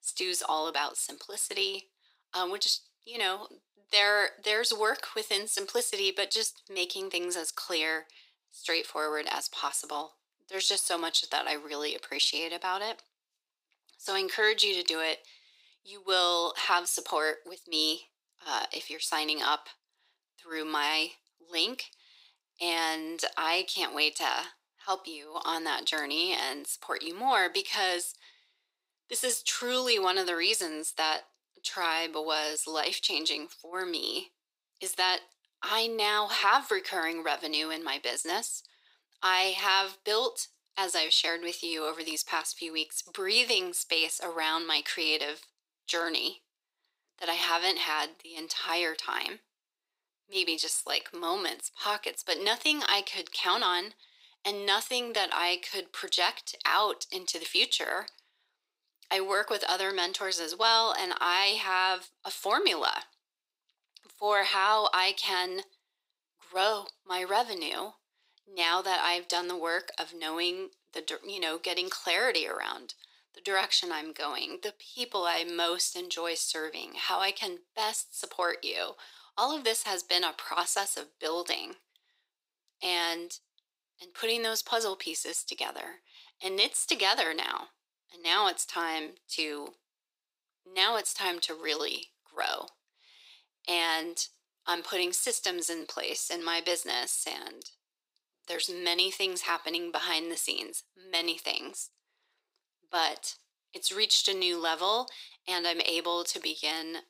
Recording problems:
thin; very; fading below 450 Hz

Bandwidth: 15.5 kHz